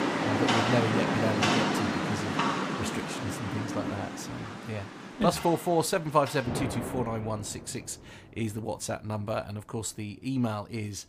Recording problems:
rain or running water; very loud; throughout; 2 dB above the speech

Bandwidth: 15 kHz